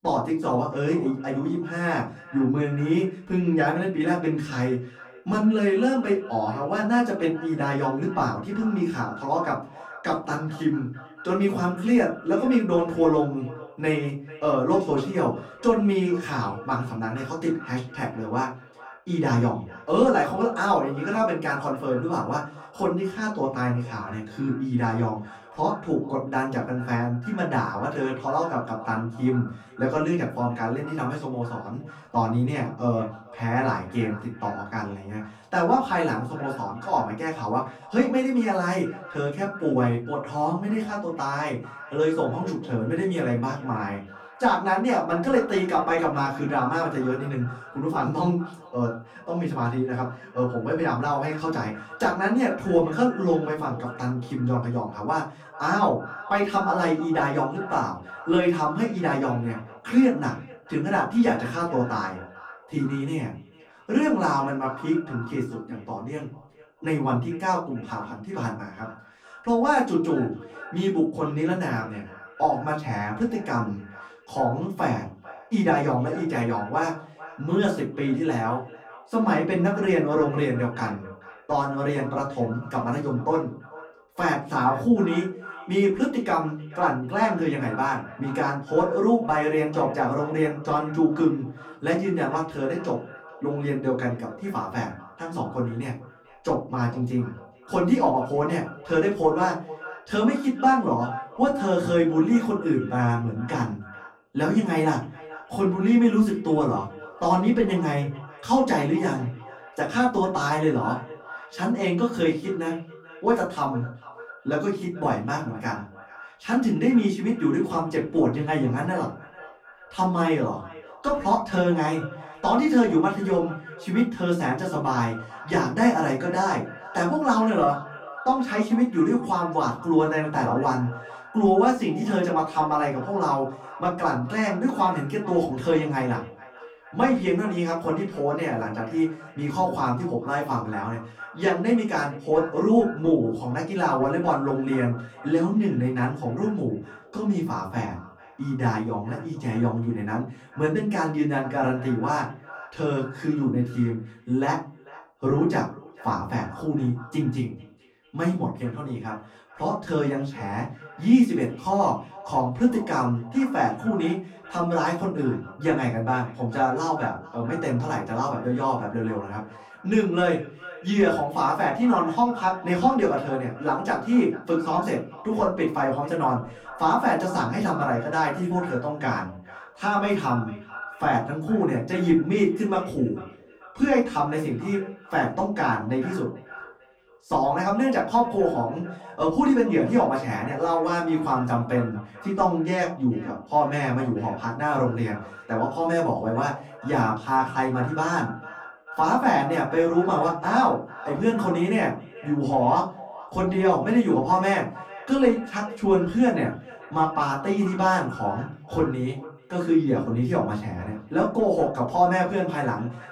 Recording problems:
off-mic speech; far
echo of what is said; faint; throughout; 440 ms later, 20 dB below the speech
room echo; slight; dies away in 0.3 s

